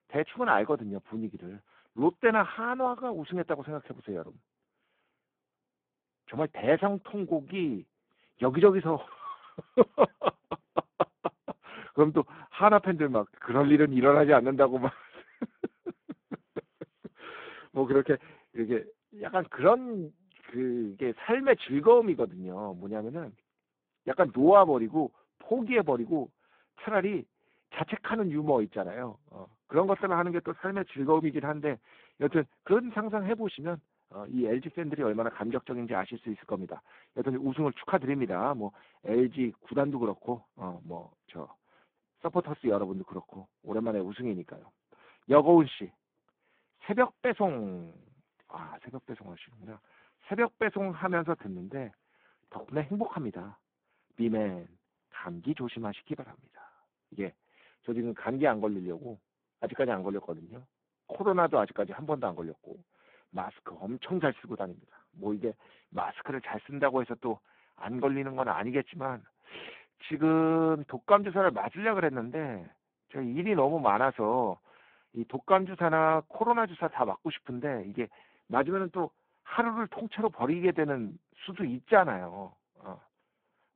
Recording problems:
phone-call audio; poor line; nothing above 3.5 kHz

